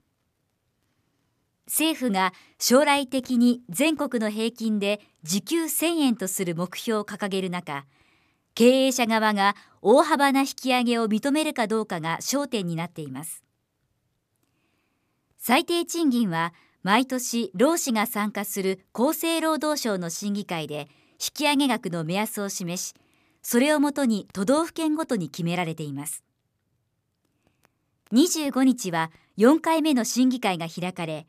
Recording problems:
none

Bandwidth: 14.5 kHz